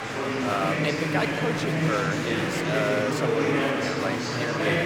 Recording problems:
murmuring crowd; very loud; throughout; 4 dB above the speech

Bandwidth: 18 kHz